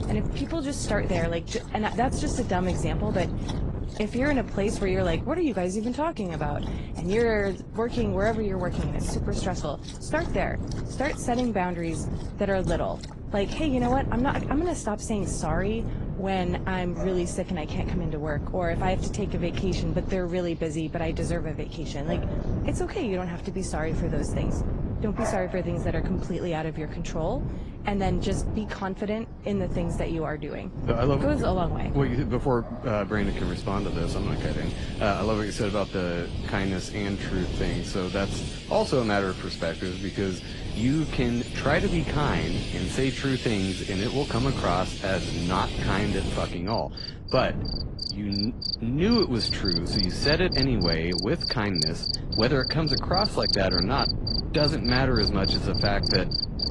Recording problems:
garbled, watery; slightly; nothing above 10 kHz
animal sounds; loud; throughout; 3 dB below the speech
wind noise on the microphone; occasional gusts; 10 dB below the speech

